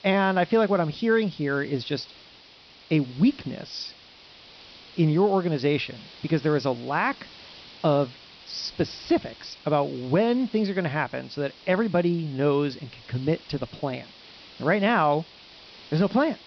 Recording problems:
high frequencies cut off; noticeable; nothing above 5.5 kHz
hiss; faint; throughout; 20 dB below the speech

